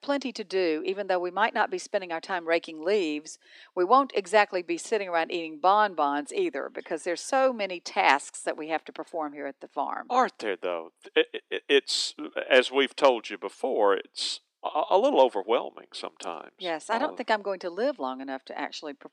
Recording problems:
thin; very slightly; fading below 250 Hz

